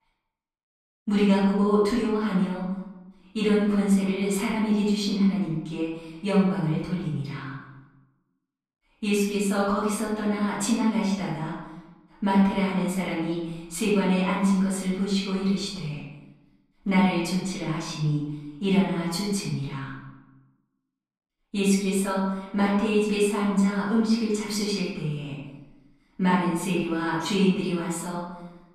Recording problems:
off-mic speech; far
room echo; noticeable; dies away in 0.9 s

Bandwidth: 14 kHz